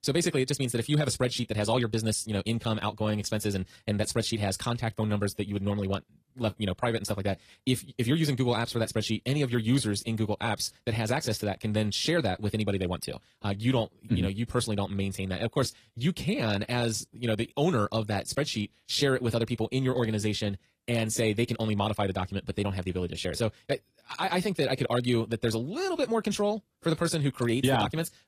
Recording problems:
wrong speed, natural pitch; too fast; 1.6 times normal speed
garbled, watery; slightly; nothing above 14.5 kHz

